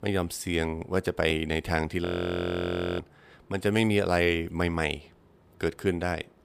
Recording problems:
audio freezing; at 2 s for 1 s

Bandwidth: 15 kHz